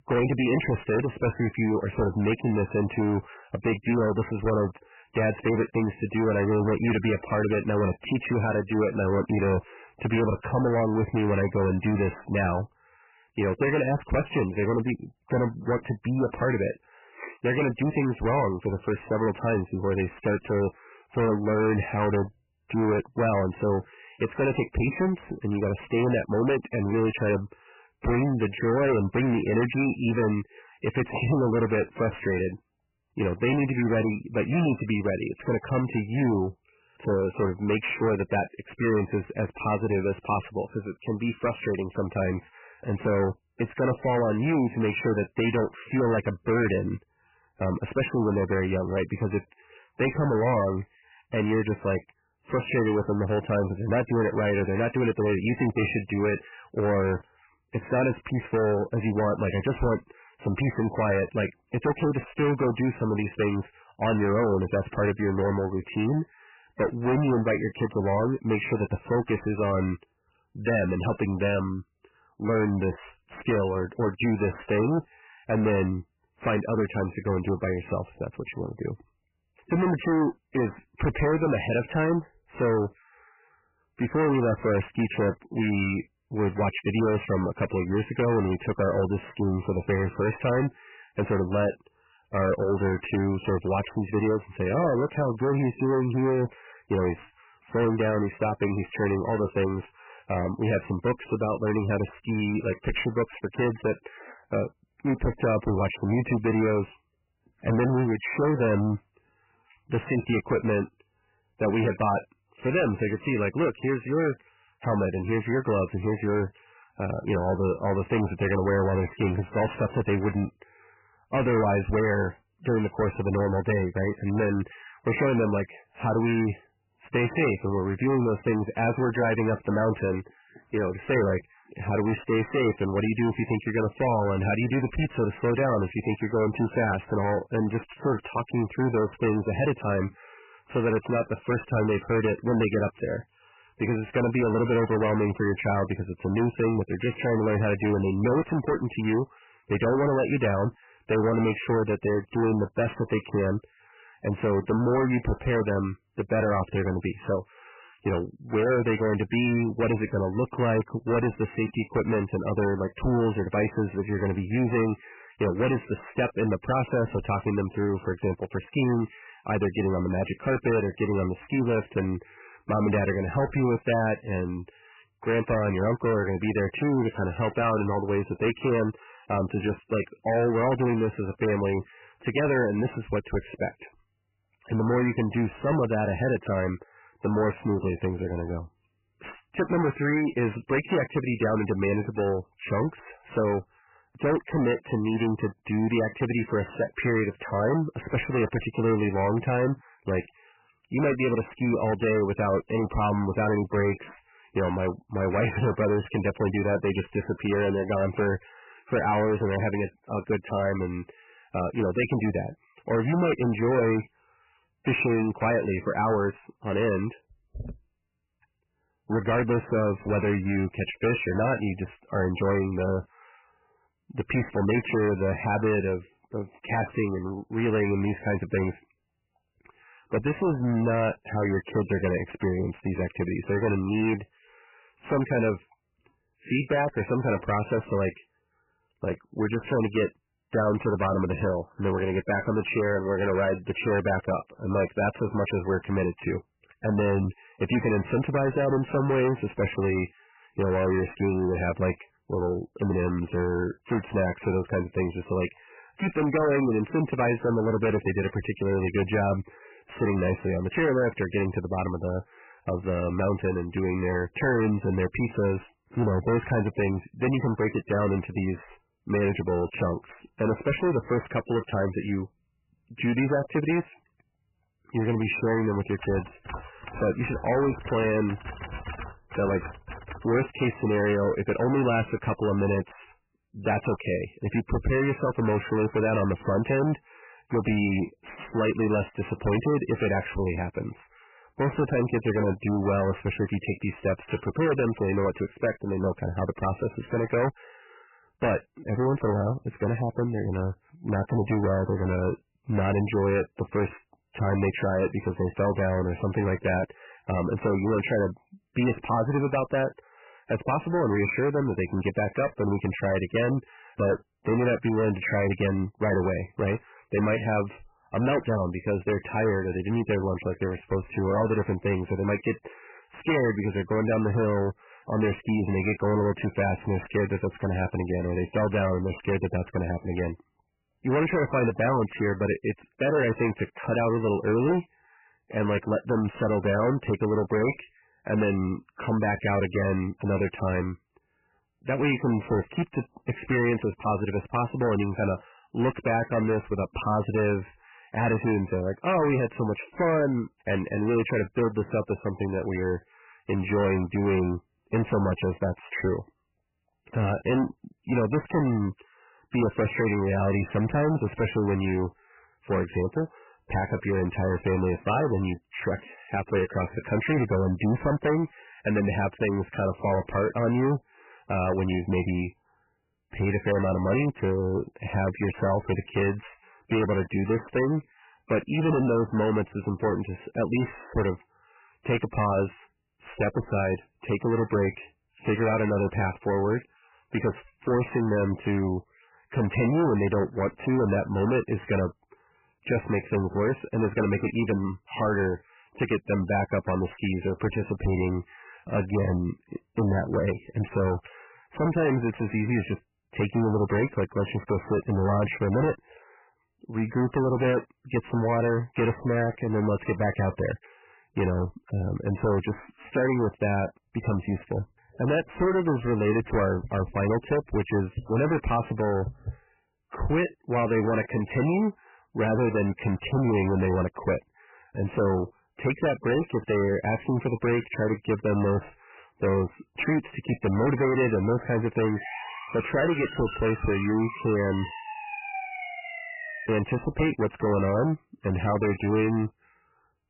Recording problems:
distortion; heavy; 16% of the sound clipped
garbled, watery; badly; nothing above 3 kHz
keyboard typing; faint; from 4:36 to 4:40; peak 10 dB below the speech
siren; noticeable; from 7:12 to 7:17; peak 6 dB below the speech

